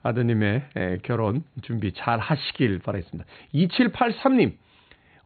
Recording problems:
high frequencies cut off; severe; nothing above 4.5 kHz

